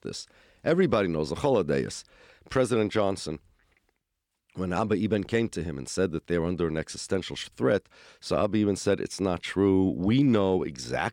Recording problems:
none

